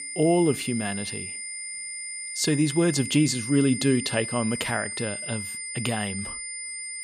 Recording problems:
high-pitched whine; loud; throughout; 9 kHz, 7 dB below the speech

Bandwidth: 15.5 kHz